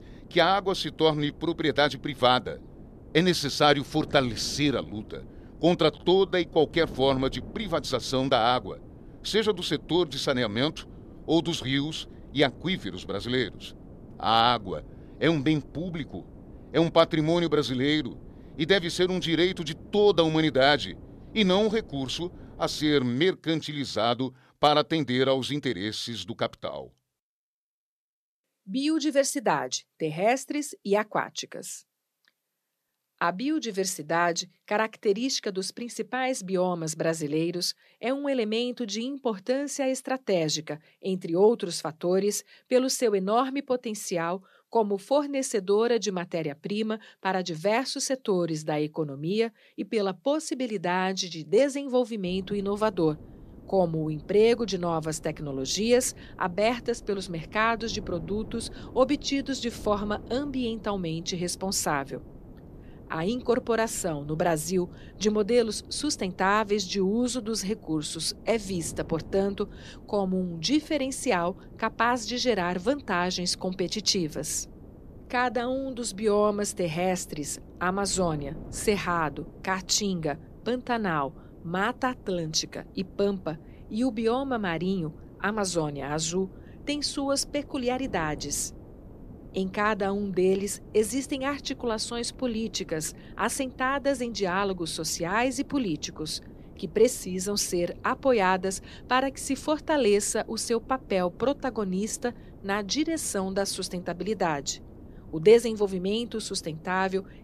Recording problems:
wind noise on the microphone; occasional gusts; until 23 s and from 52 s on; 25 dB below the speech

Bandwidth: 14 kHz